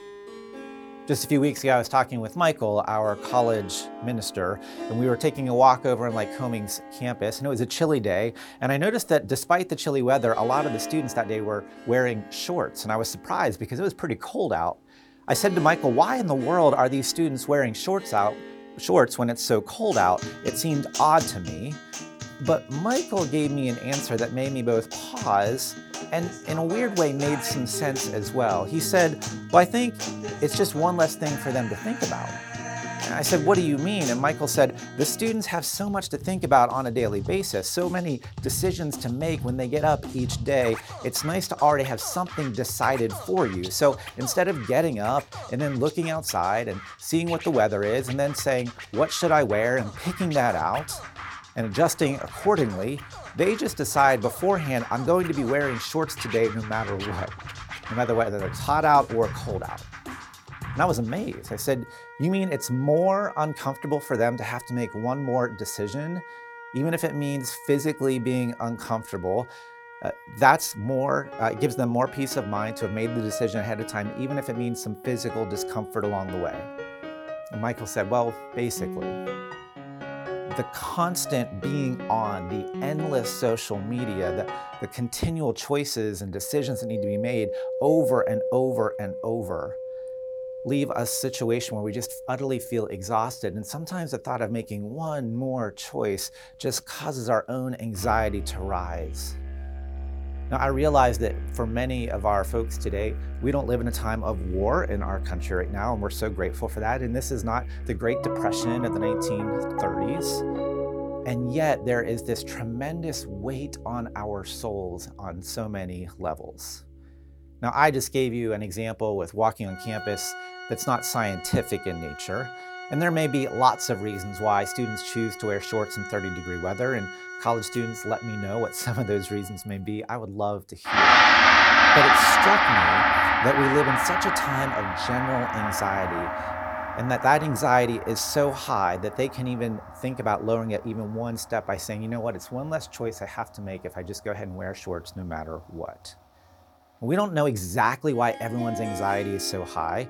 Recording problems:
background music; loud; throughout; 3 dB below the speech

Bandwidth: 18 kHz